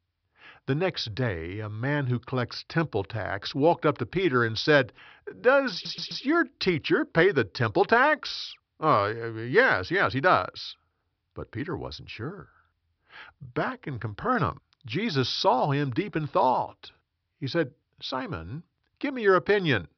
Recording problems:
high frequencies cut off; noticeable; nothing above 5.5 kHz
audio stuttering; at 5.5 s

